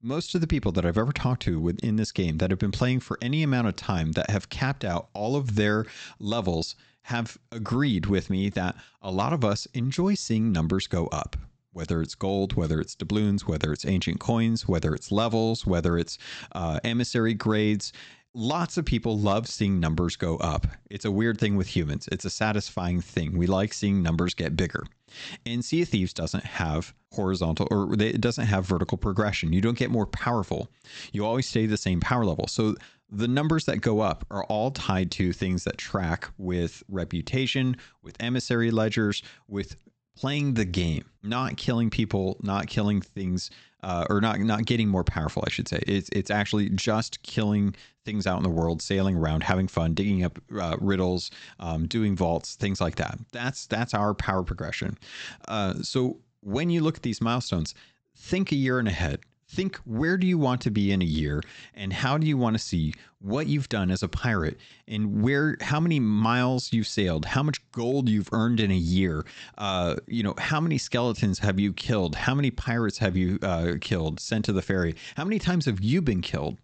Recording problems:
high frequencies cut off; noticeable; nothing above 8 kHz

